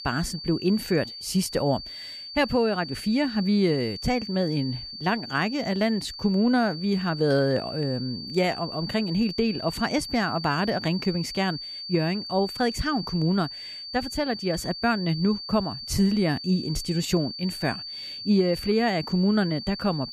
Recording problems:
high-pitched whine; loud; throughout; 4.5 kHz, 9 dB below the speech

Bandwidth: 14.5 kHz